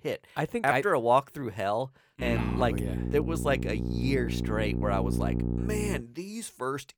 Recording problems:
electrical hum; loud; from 2 to 6 s; 60 Hz, 9 dB below the speech

